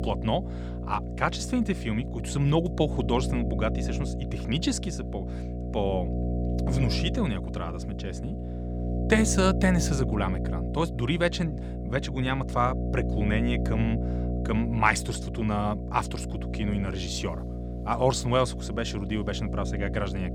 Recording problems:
electrical hum; loud; throughout; 60 Hz, 10 dB below the speech

